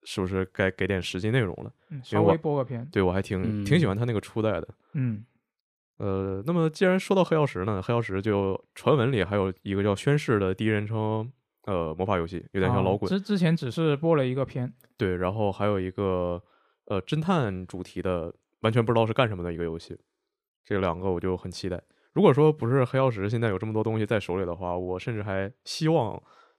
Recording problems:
none

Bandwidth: 14.5 kHz